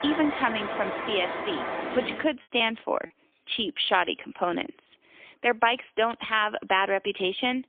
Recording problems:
phone-call audio; poor line; nothing above 3.5 kHz
traffic noise; loud; until 2 s; 5 dB below the speech
choppy; very; at 2.5 s; 5% of the speech affected

